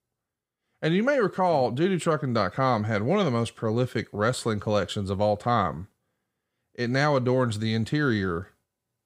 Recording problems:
none

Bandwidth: 15.5 kHz